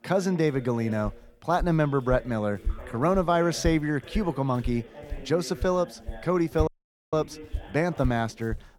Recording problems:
voice in the background; noticeable; throughout; 20 dB below the speech
footsteps; noticeable; from 1 s on; peak 8 dB below the speech
audio cutting out; at 6.5 s

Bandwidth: 18.5 kHz